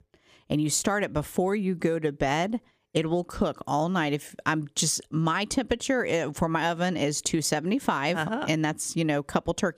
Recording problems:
squashed, flat; somewhat

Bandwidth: 15 kHz